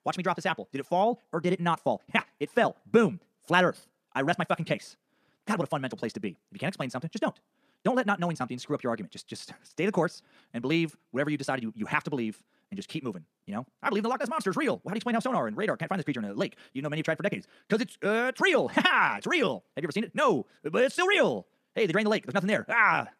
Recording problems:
wrong speed, natural pitch; too fast; 1.7 times normal speed

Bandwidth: 14.5 kHz